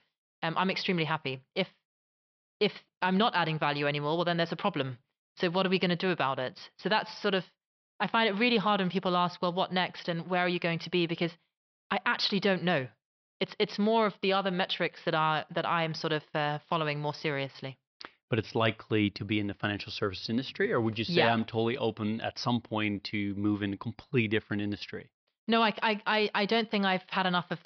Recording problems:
high frequencies cut off; noticeable; nothing above 5.5 kHz

